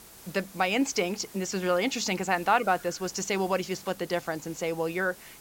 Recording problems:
high frequencies cut off; noticeable; nothing above 8 kHz
hiss; noticeable; throughout; 20 dB below the speech

